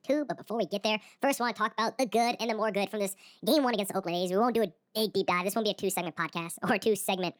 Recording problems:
wrong speed and pitch; too fast and too high; 1.6 times normal speed

